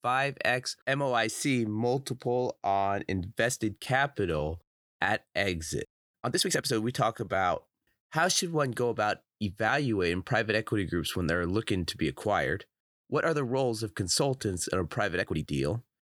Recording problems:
uneven, jittery; strongly; from 1 to 15 s

